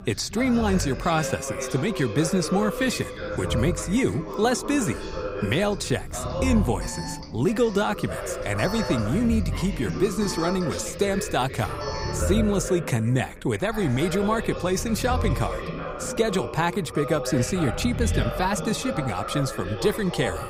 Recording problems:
background chatter; loud; throughout; 3 voices, 8 dB below the speech
low rumble; faint; throughout; 20 dB below the speech
alarm; noticeable; from 4 to 12 s; peak 10 dB below the speech

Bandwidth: 15.5 kHz